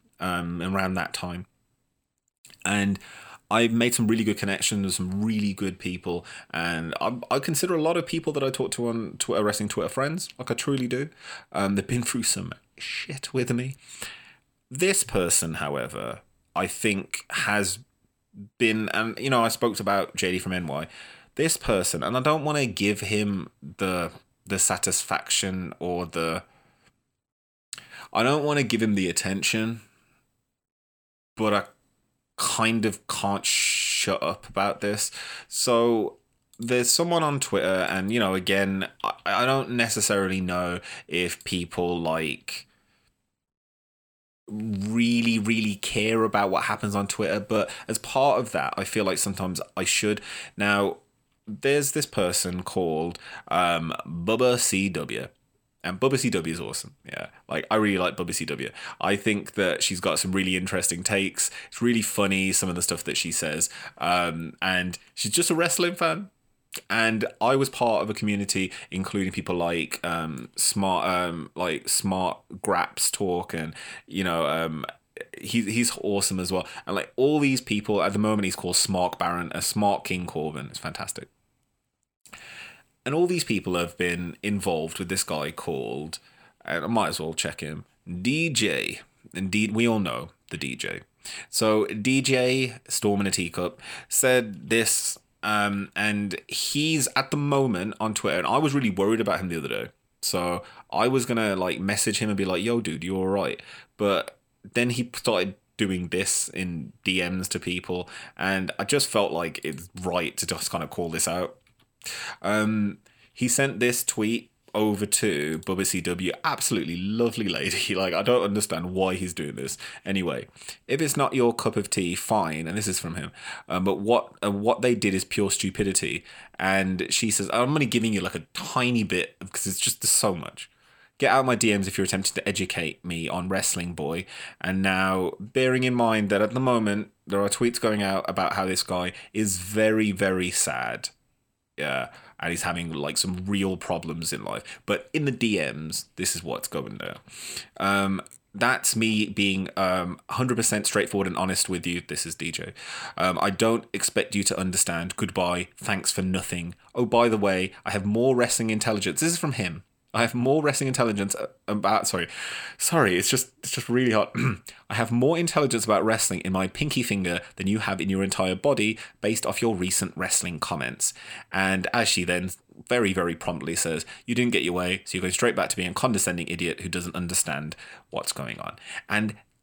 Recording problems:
none

